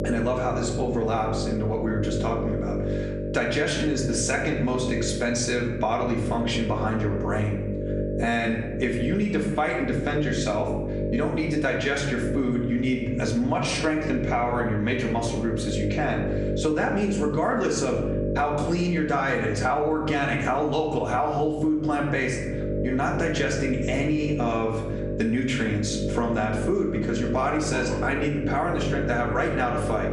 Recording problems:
off-mic speech; far
room echo; slight; dies away in 0.7 s
squashed, flat; somewhat
electrical hum; loud; throughout; 50 Hz, 8 dB below the speech

